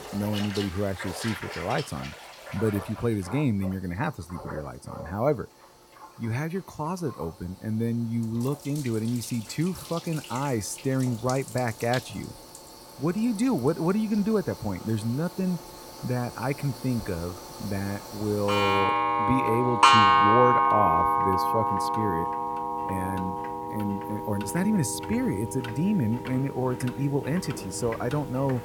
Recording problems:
household noises; very loud; throughout; 2 dB above the speech

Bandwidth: 17 kHz